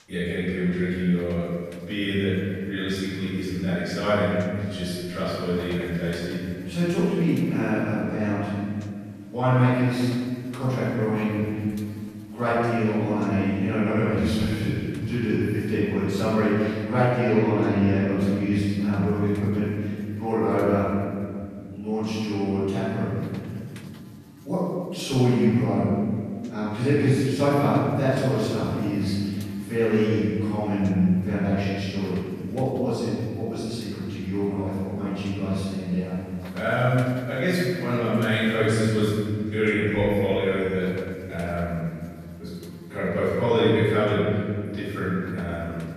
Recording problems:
room echo; strong; dies away in 2.6 s
off-mic speech; far
electrical hum; faint; throughout; 60 Hz, 25 dB below the speech

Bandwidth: 14 kHz